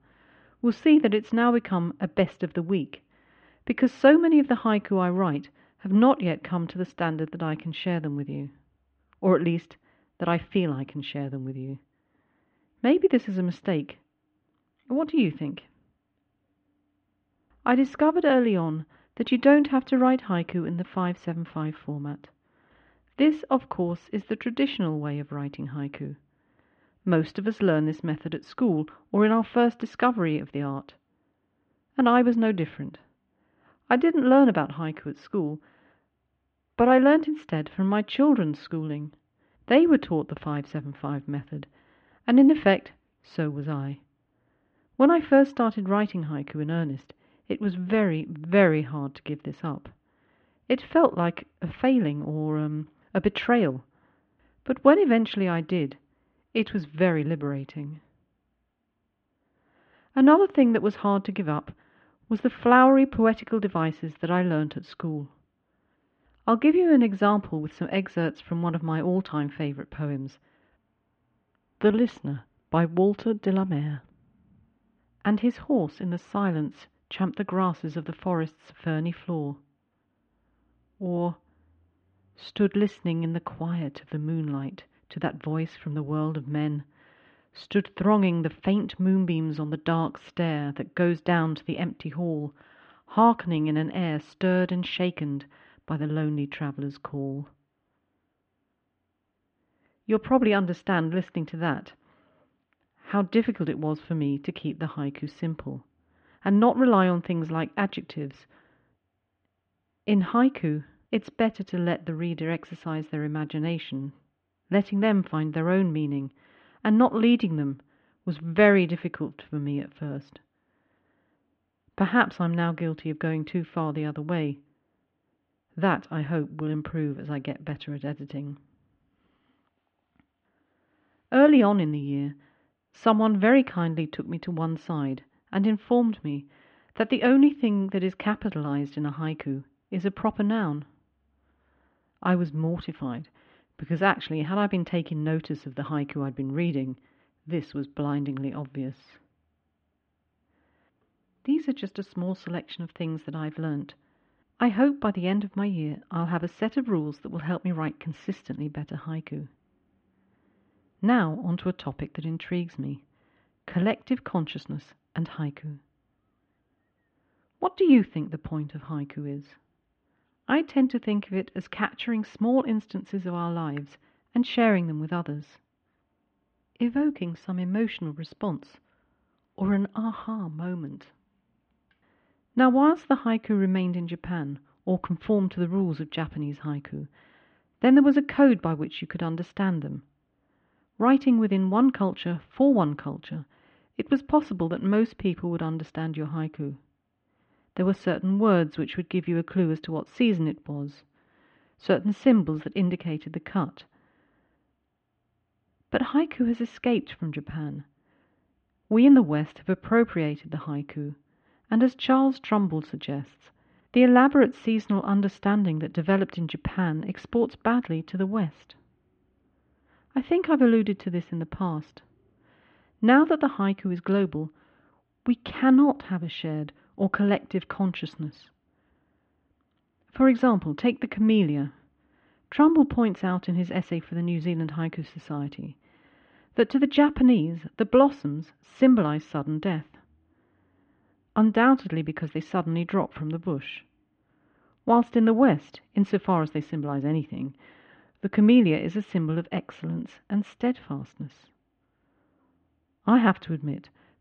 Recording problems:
muffled; very; fading above 3 kHz

